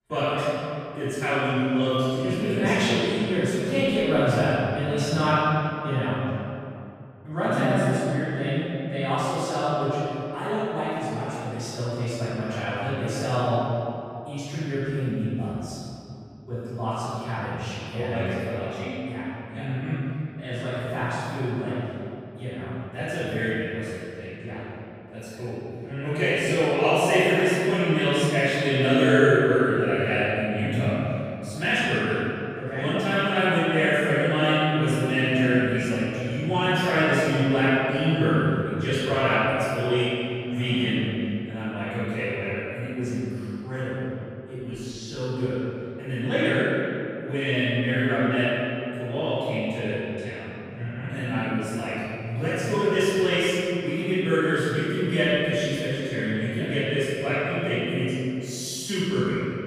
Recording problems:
room echo; strong; dies away in 2.5 s
off-mic speech; far

